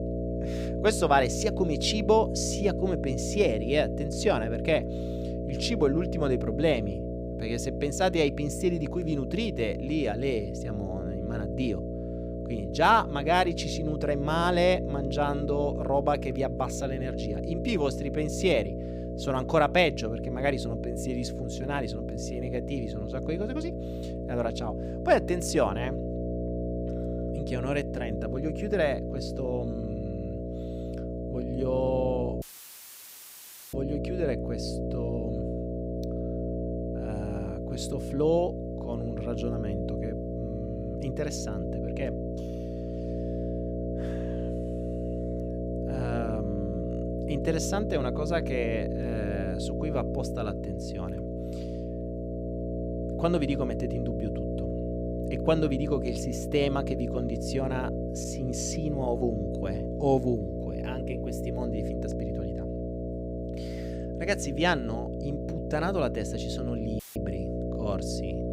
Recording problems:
electrical hum; loud; throughout; 60 Hz, 7 dB below the speech
audio cutting out; filled with static; at 32 s for 1.5 s and at 1:07

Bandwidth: 15.5 kHz